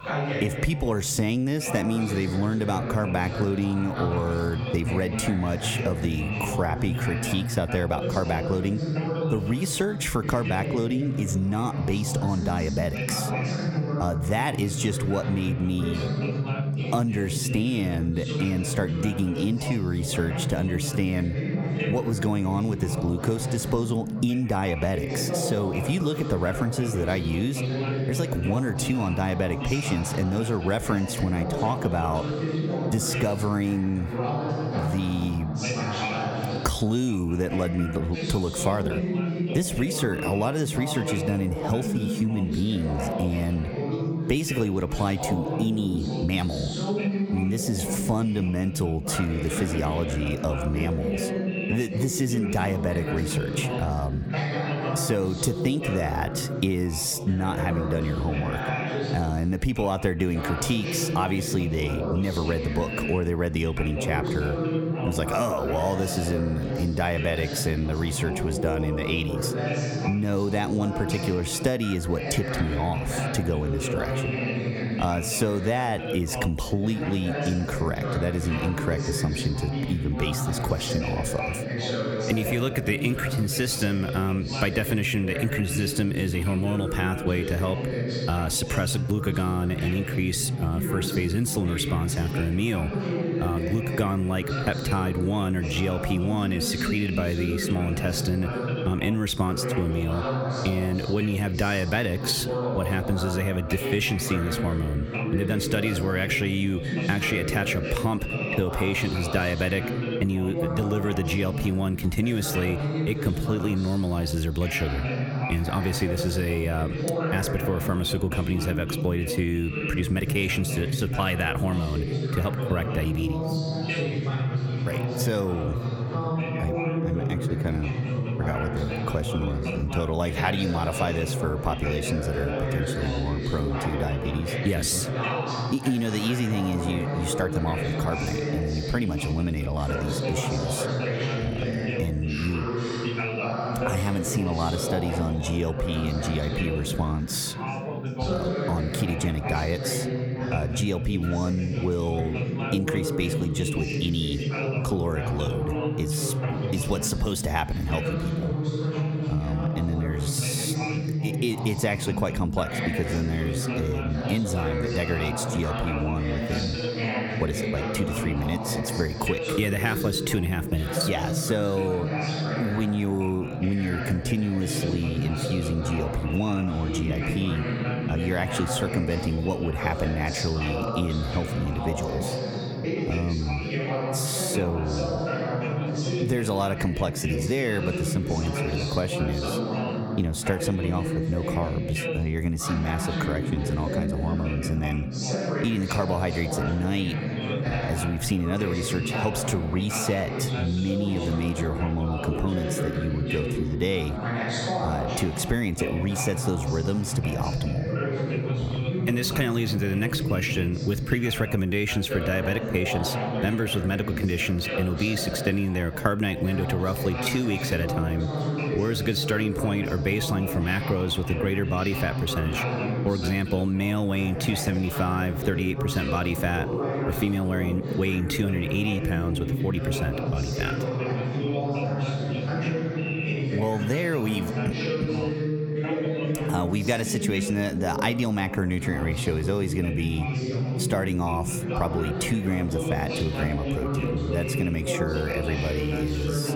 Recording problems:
squashed, flat; somewhat
background chatter; loud; throughout; 3 voices, 3 dB below the speech

